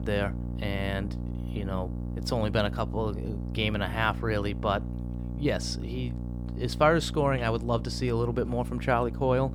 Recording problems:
electrical hum; noticeable; throughout; 60 Hz, 15 dB below the speech

